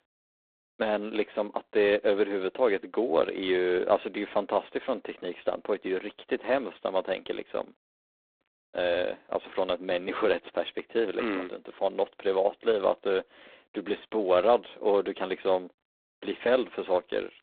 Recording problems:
phone-call audio; poor line; nothing above 3.5 kHz

